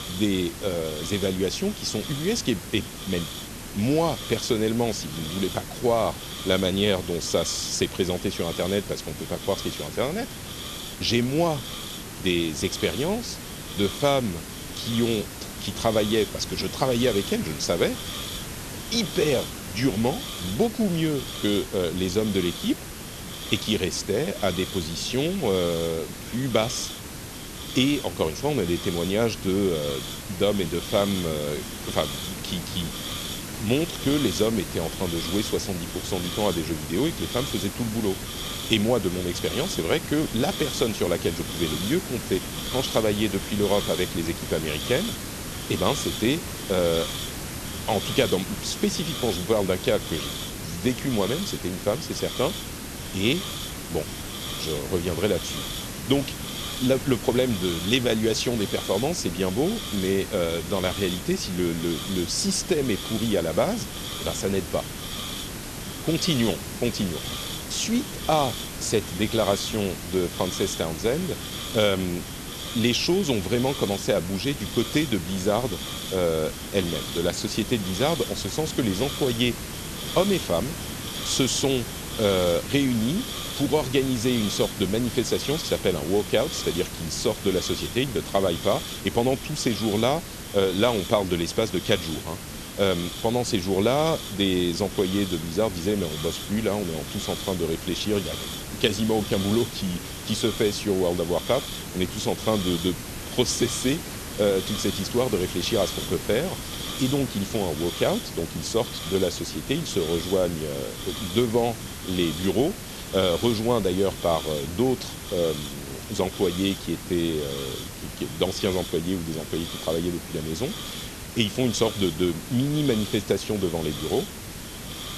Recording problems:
hiss; loud; throughout; 7 dB below the speech

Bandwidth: 13.5 kHz